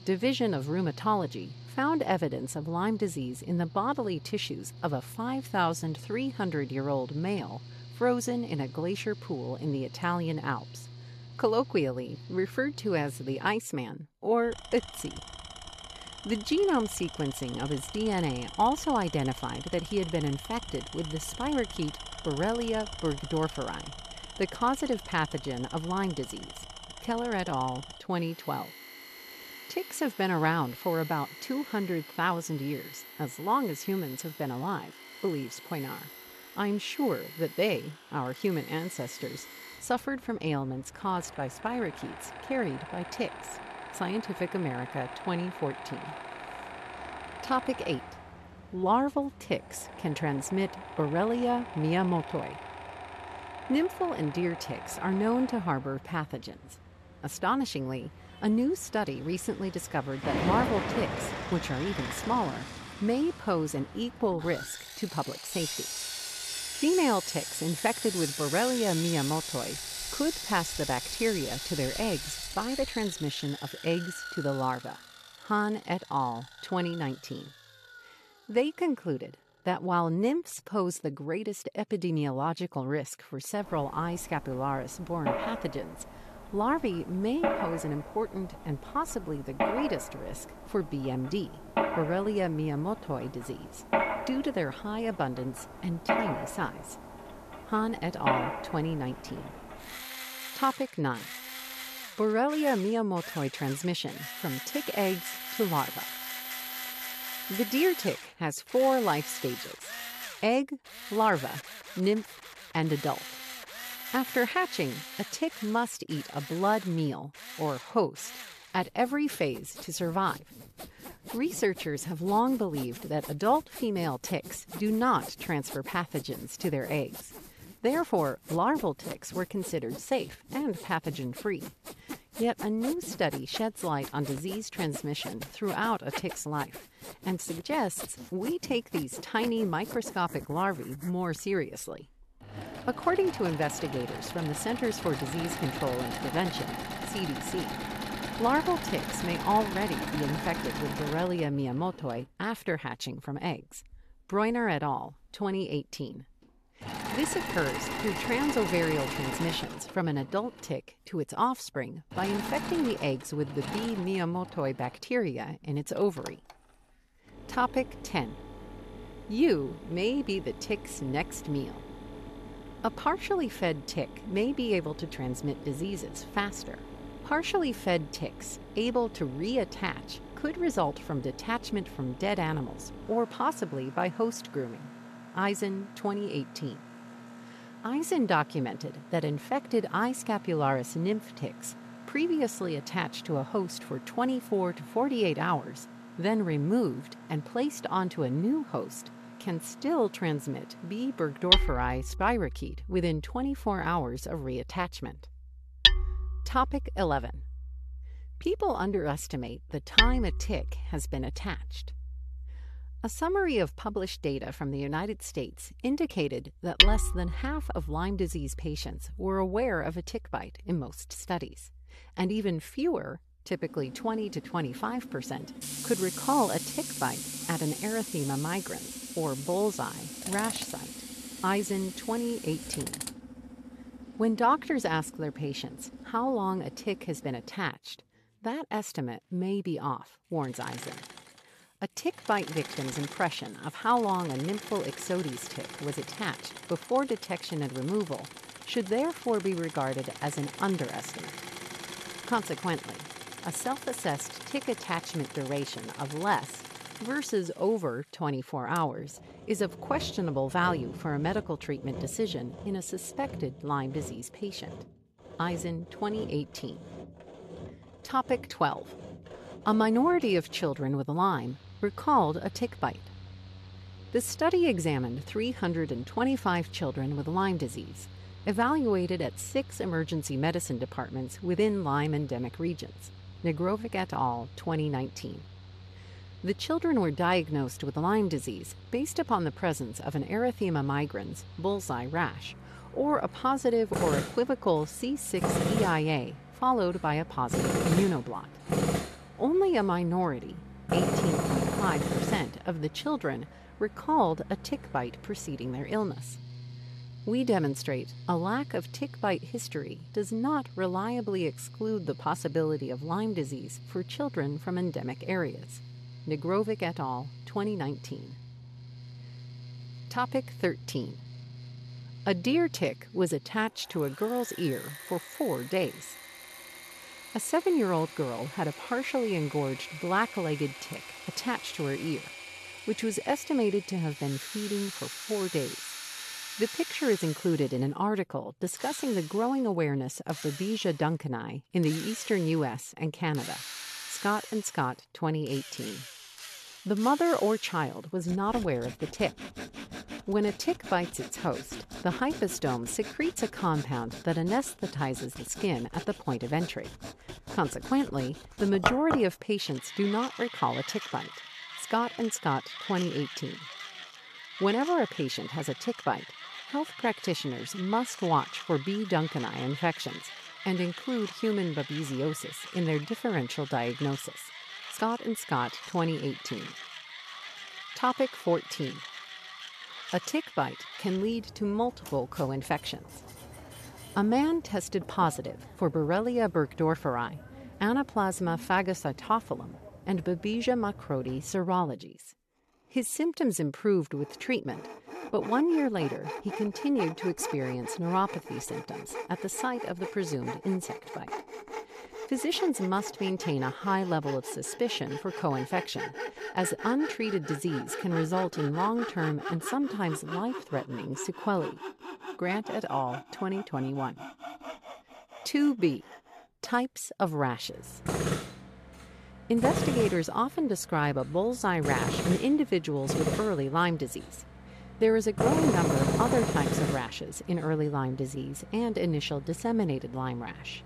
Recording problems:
machinery noise; loud; throughout; 7 dB below the speech

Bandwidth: 14 kHz